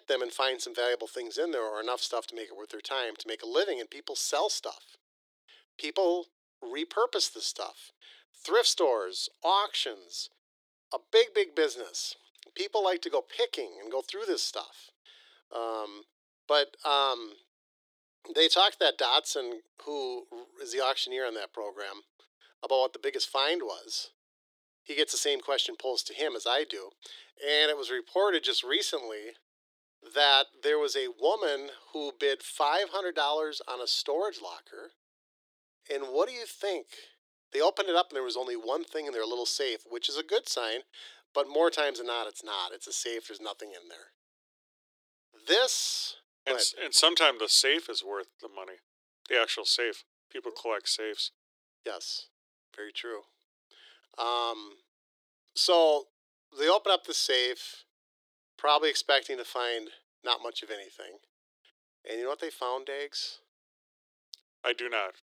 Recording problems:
thin; very; fading below 350 Hz

